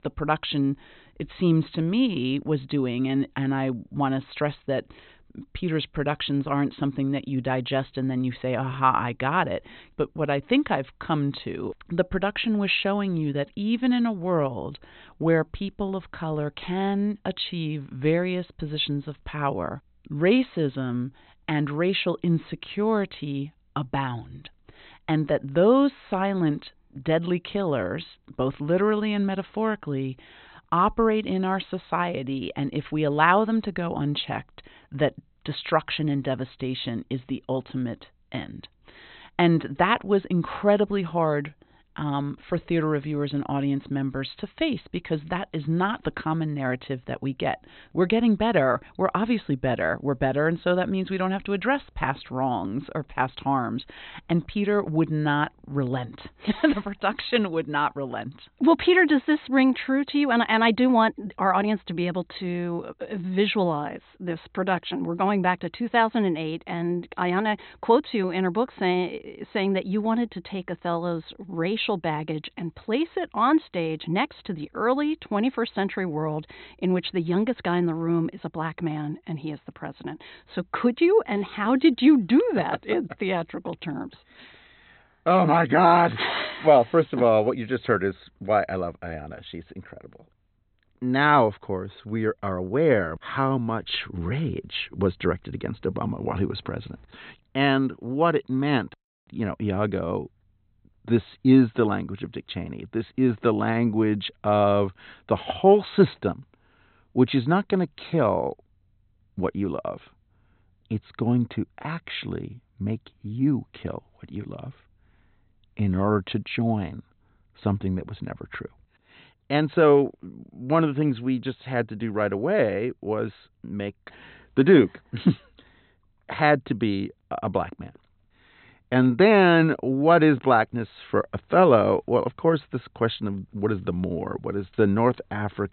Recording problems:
high frequencies cut off; severe; nothing above 4 kHz

